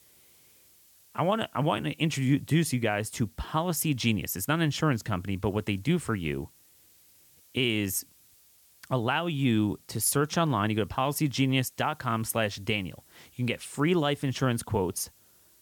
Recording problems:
hiss; faint; throughout; 30 dB below the speech

